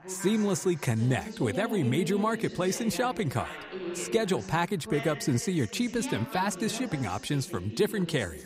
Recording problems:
background chatter; noticeable; throughout; 2 voices, 10 dB below the speech

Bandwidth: 15.5 kHz